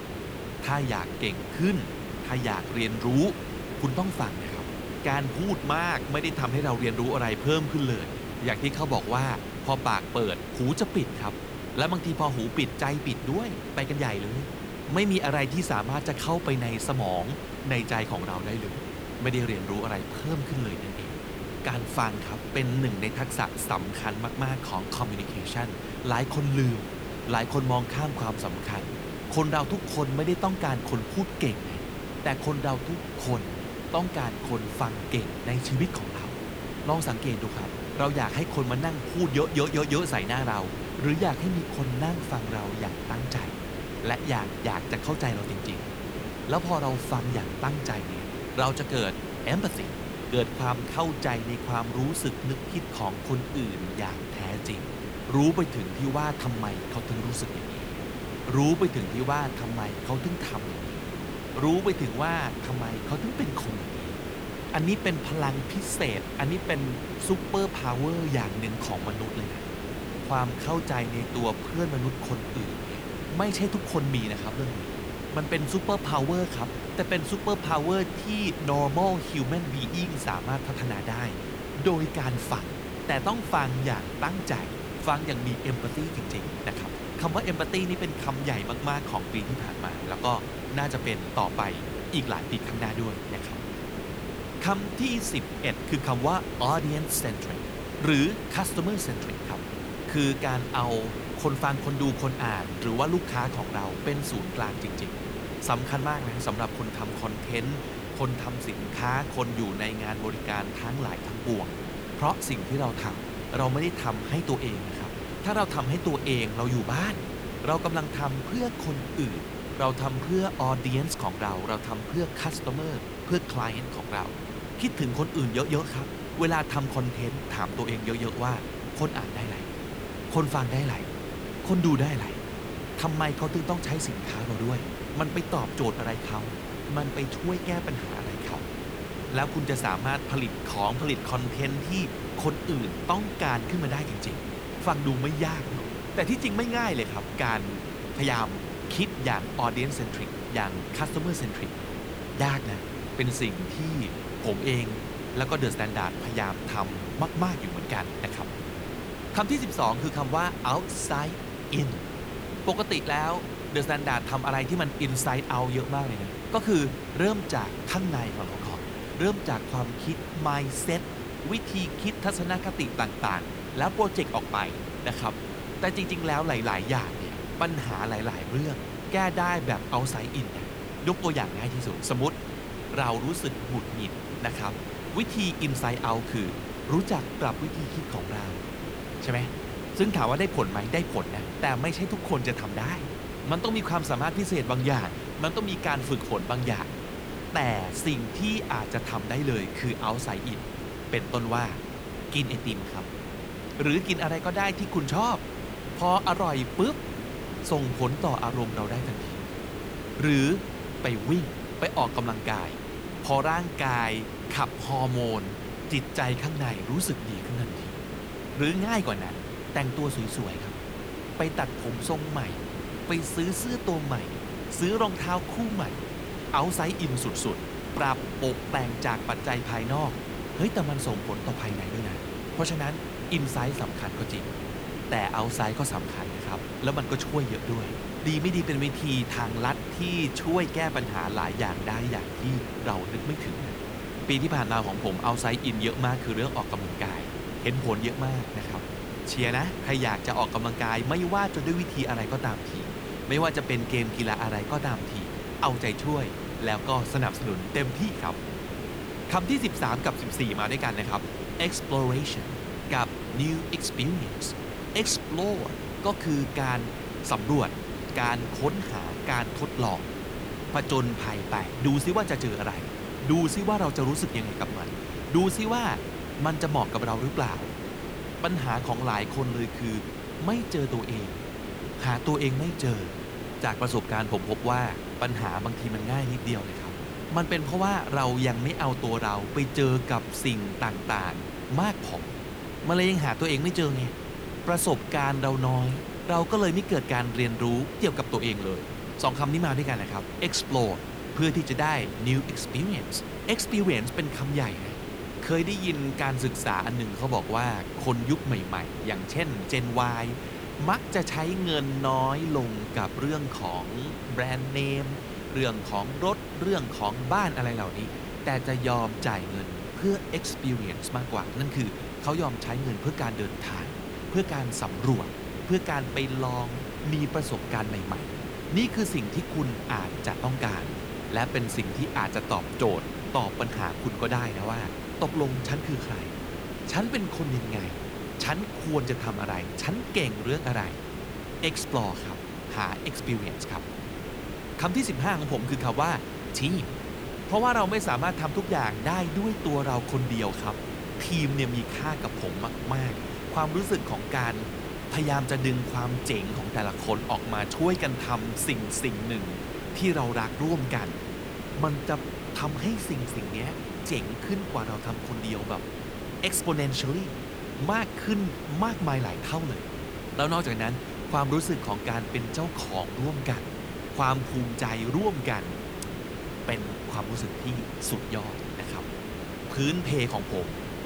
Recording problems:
hiss; loud; throughout; 6 dB below the speech

